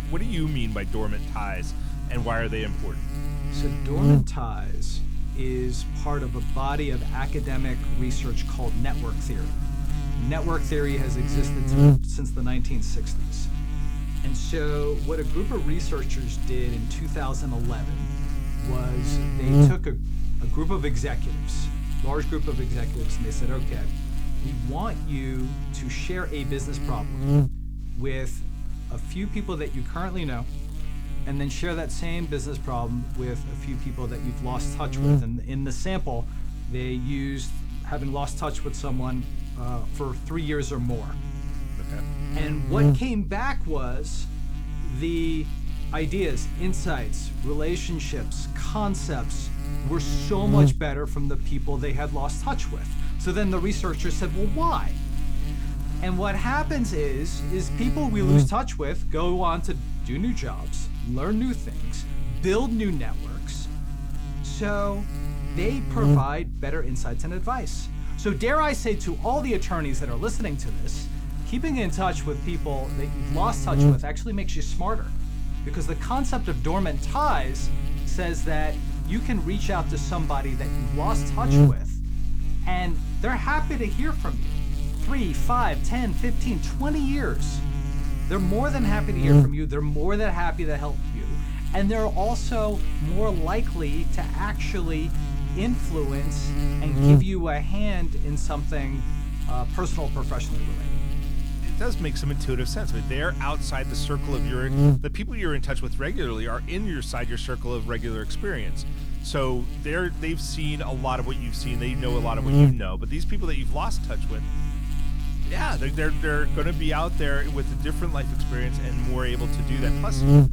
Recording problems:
electrical hum; loud; throughout; 50 Hz, 7 dB below the speech

